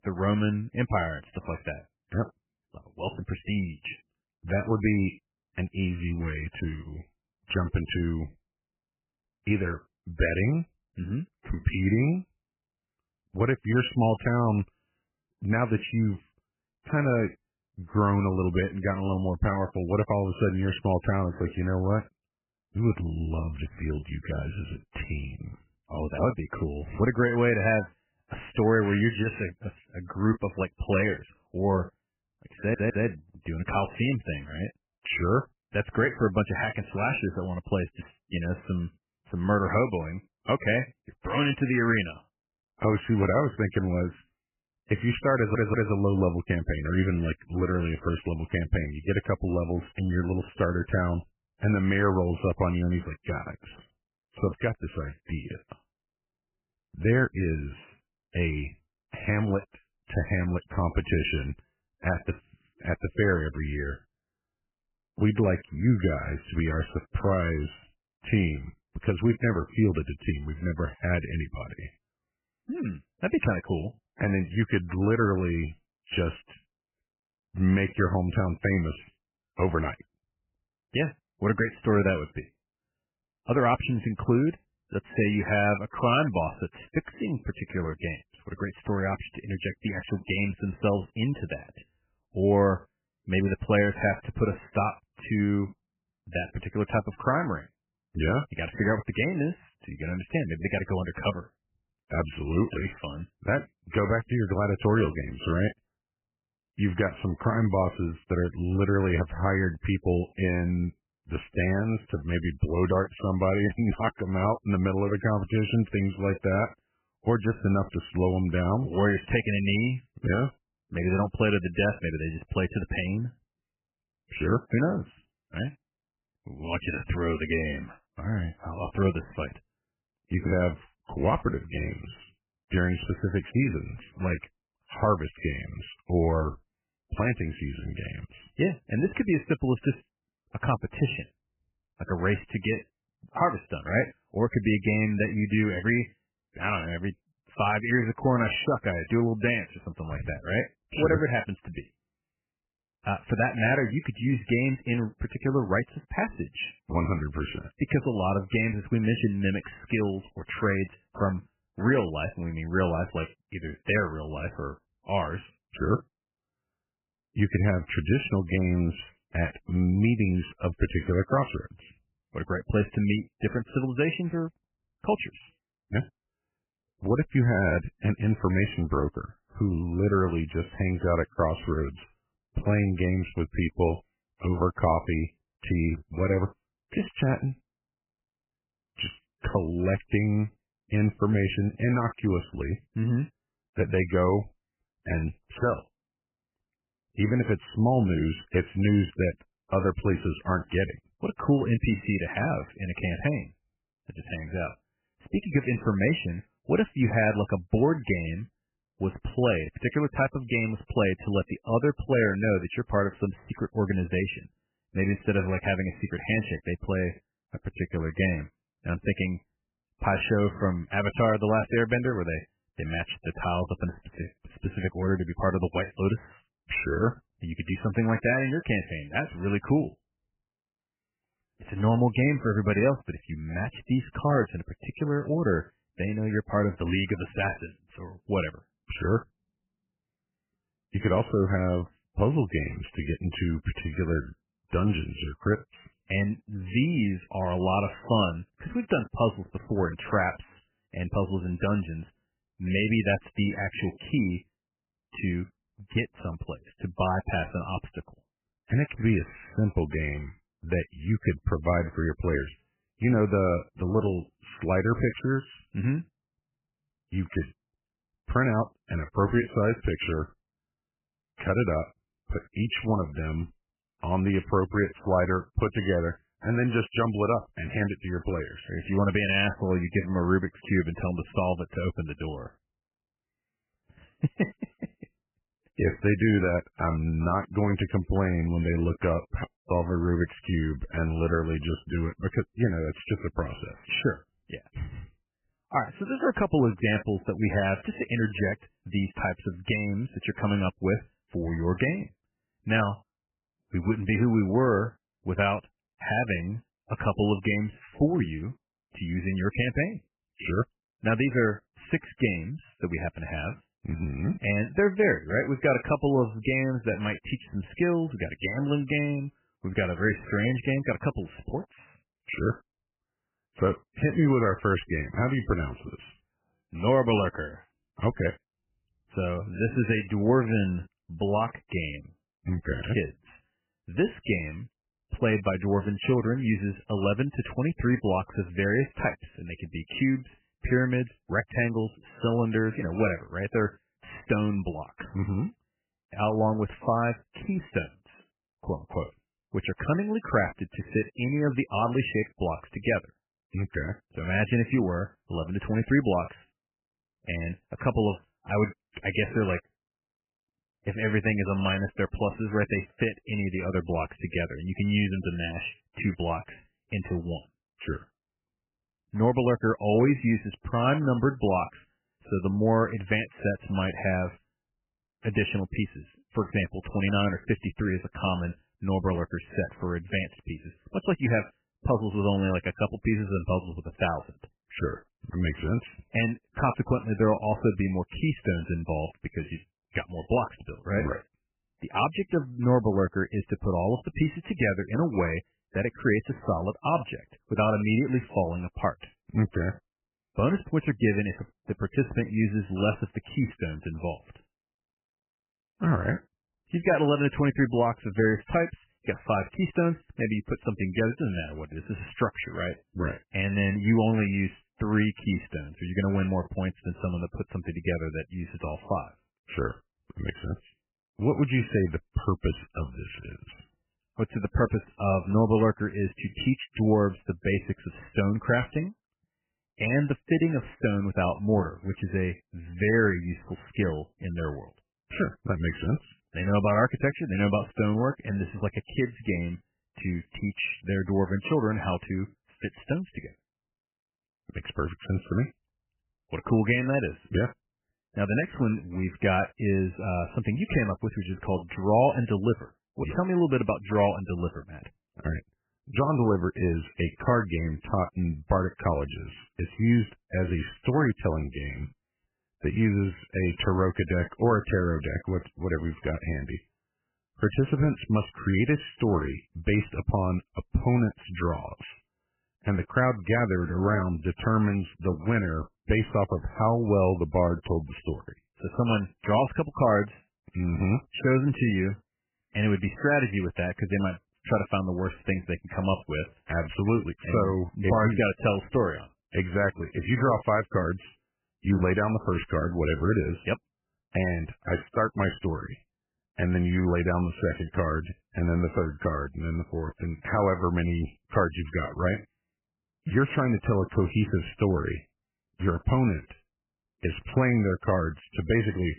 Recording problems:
garbled, watery; badly; nothing above 3 kHz
audio stuttering; at 33 s and at 45 s
audio cutting out; at 4:49

